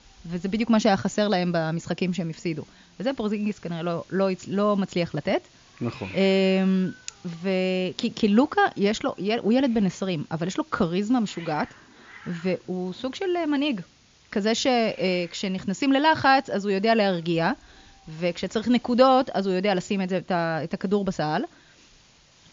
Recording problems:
high frequencies cut off; noticeable; nothing above 7 kHz
hiss; faint; throughout; 25 dB below the speech

